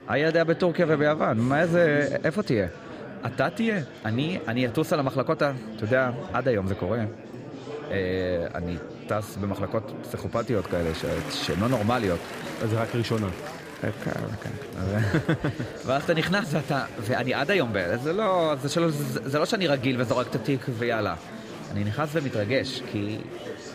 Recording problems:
murmuring crowd; noticeable; throughout; 10 dB below the speech

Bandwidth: 15 kHz